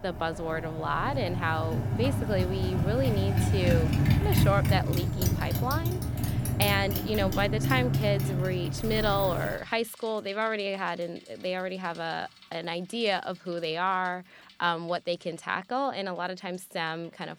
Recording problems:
traffic noise; very loud; throughout; 2 dB above the speech

